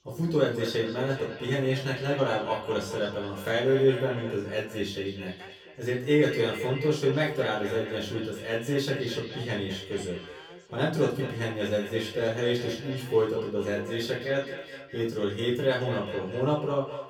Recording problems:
echo of what is said; strong; throughout; 210 ms later, 10 dB below the speech
off-mic speech; far
room echo; slight; dies away in 0.3 s
voice in the background; faint; throughout; 20 dB below the speech

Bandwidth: 18.5 kHz